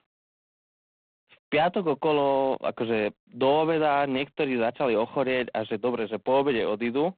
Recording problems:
phone-call audio; poor line; nothing above 4 kHz

